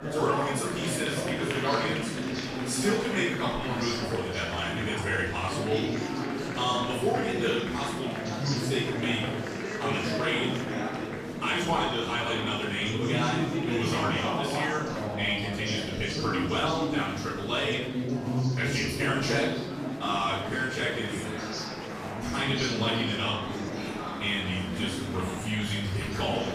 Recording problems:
off-mic speech; far
room echo; noticeable; dies away in 0.6 s
murmuring crowd; loud; throughout; 2 dB below the speech

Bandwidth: 14.5 kHz